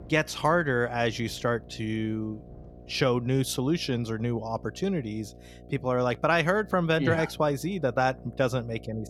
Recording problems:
electrical hum; faint; throughout; 60 Hz, 25 dB below the speech
rain or running water; faint; throughout; 30 dB below the speech

